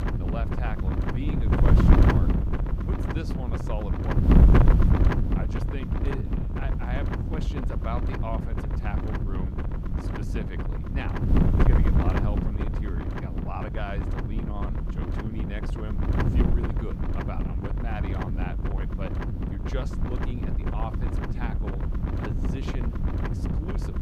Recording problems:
wind noise on the microphone; heavy; 4 dB above the speech

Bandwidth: 15 kHz